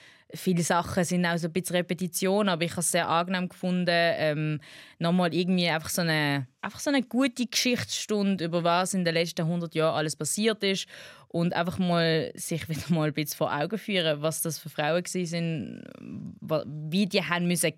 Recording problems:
none

